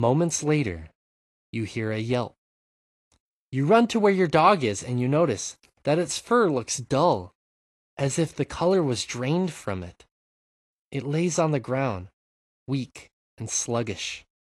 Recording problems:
garbled, watery; slightly
abrupt cut into speech; at the start

